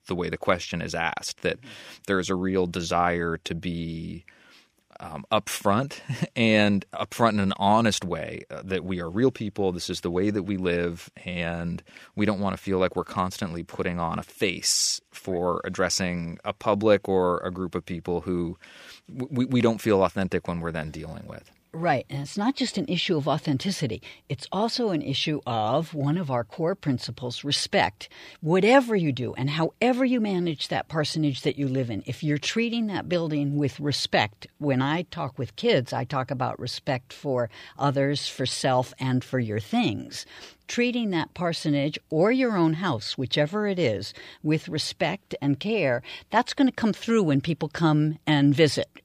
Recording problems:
none

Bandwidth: 15 kHz